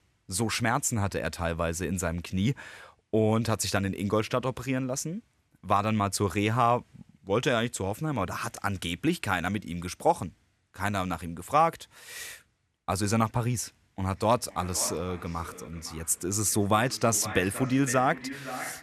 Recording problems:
echo of what is said; noticeable; from 14 s on; 510 ms later, 10 dB below the speech

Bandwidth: 13.5 kHz